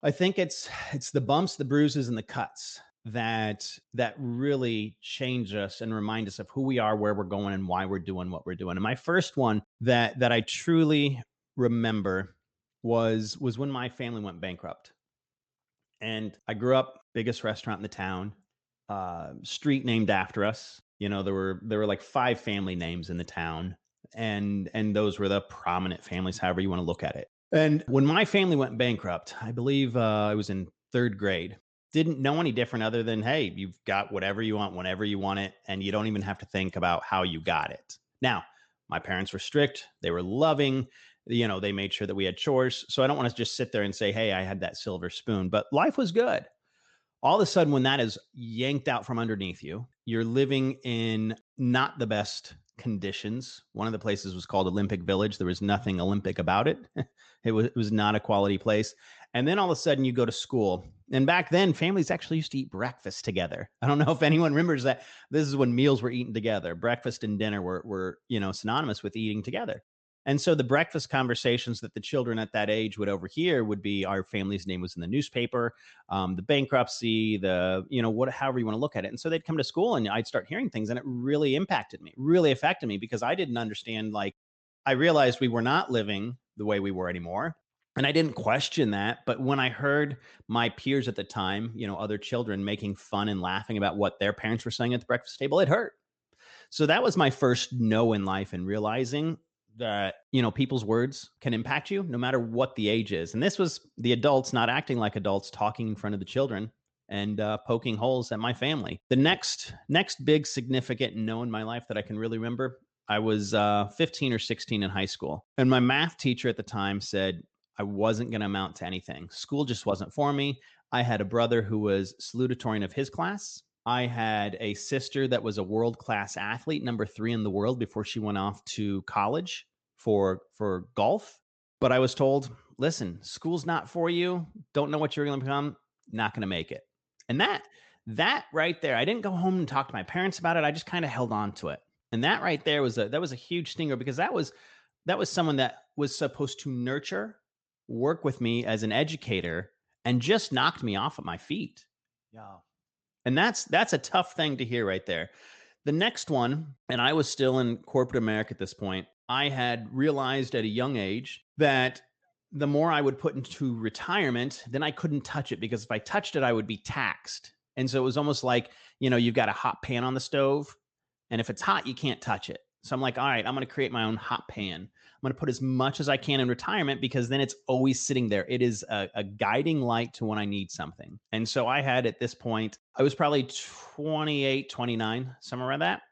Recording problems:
high frequencies cut off; noticeable; nothing above 8 kHz

